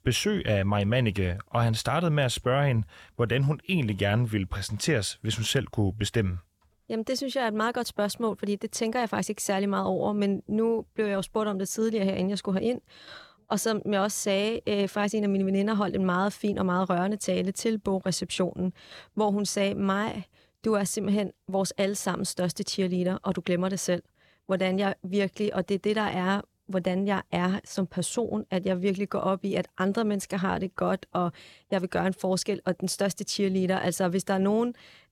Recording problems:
none

